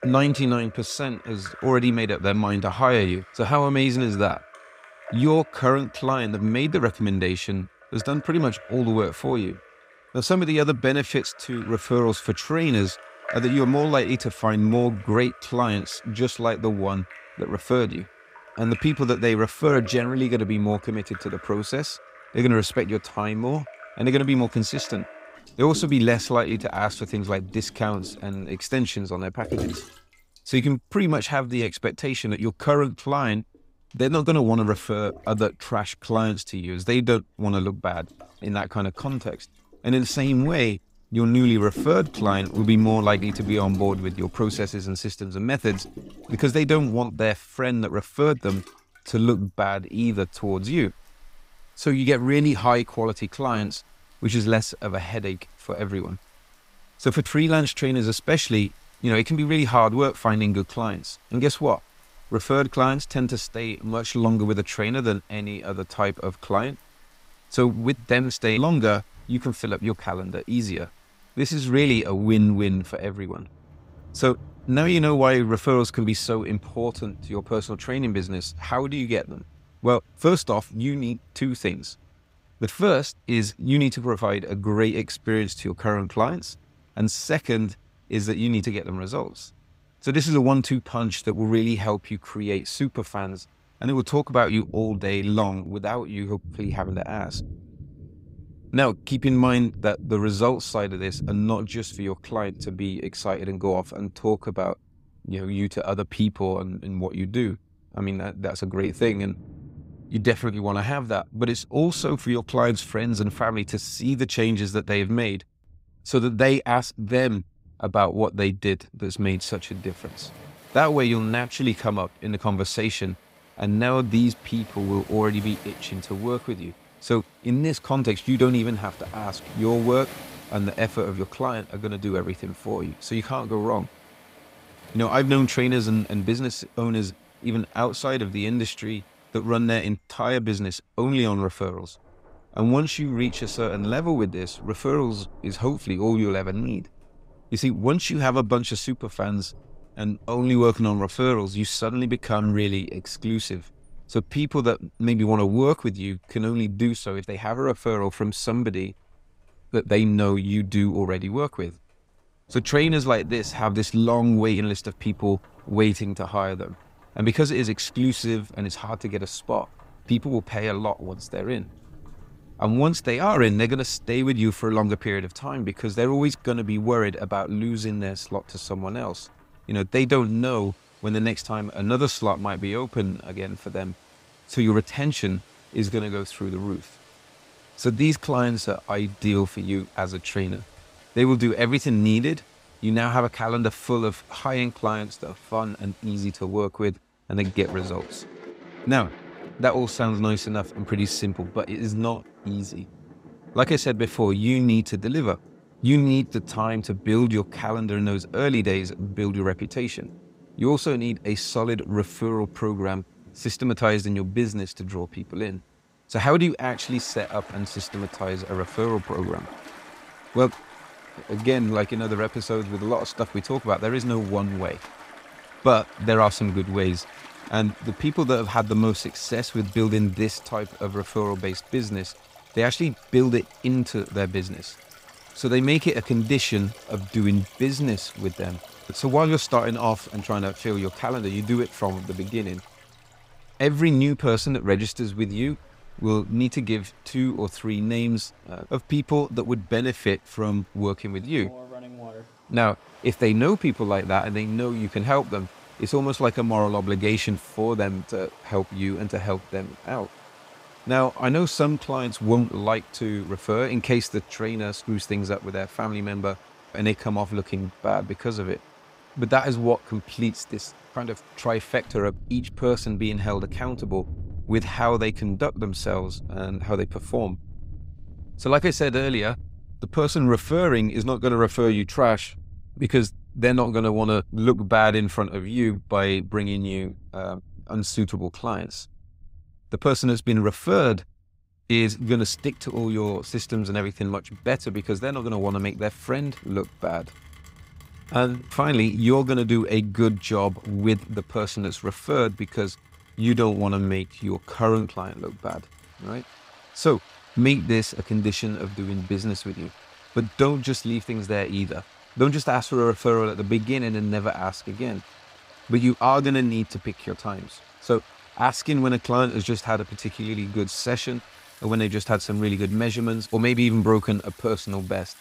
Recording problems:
rain or running water; faint; throughout; 20 dB below the speech

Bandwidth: 15.5 kHz